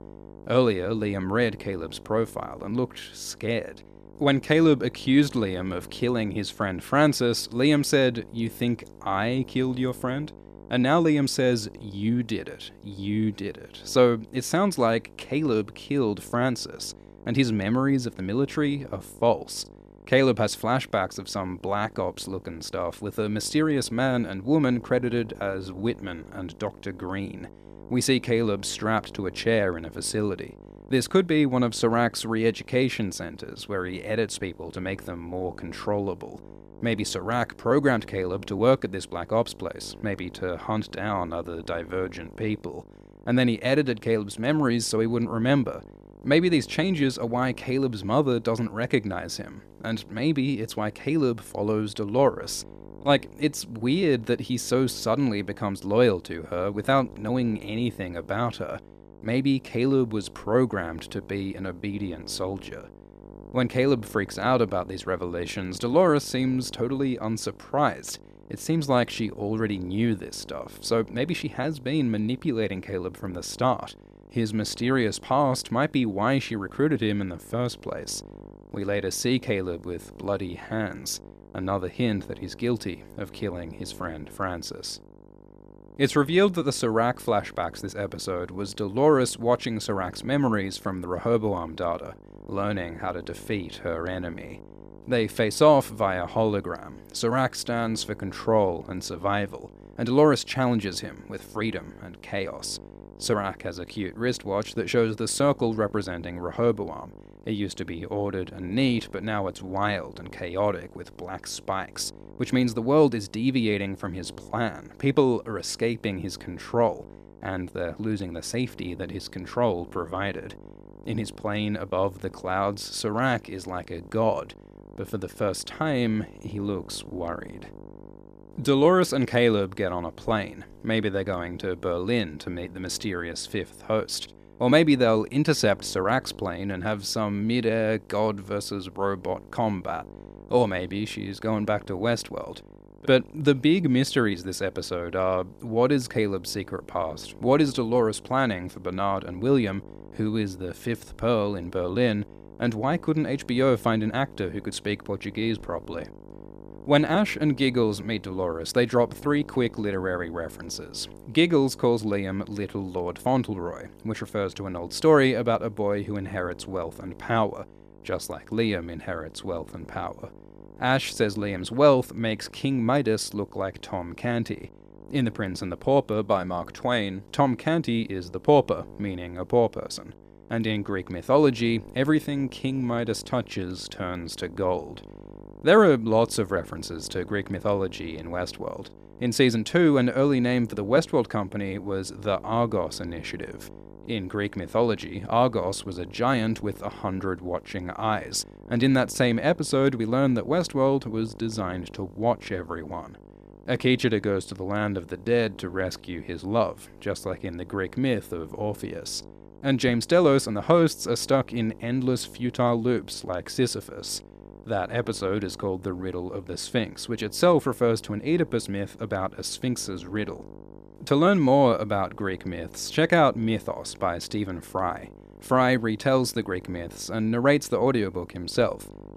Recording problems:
electrical hum; faint; throughout; 50 Hz, 25 dB below the speech

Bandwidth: 14.5 kHz